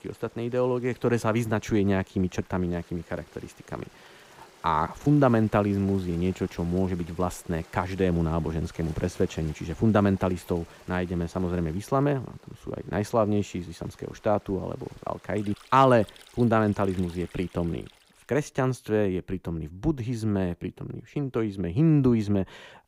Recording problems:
rain or running water; faint; until 18 s; 25 dB below the speech

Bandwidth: 15.5 kHz